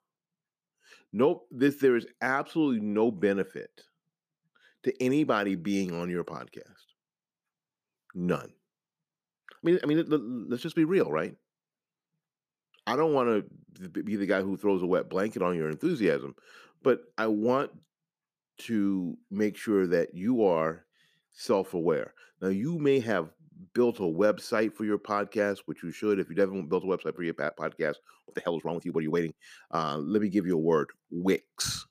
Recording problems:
uneven, jittery; strongly; from 9.5 to 29 s

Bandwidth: 15 kHz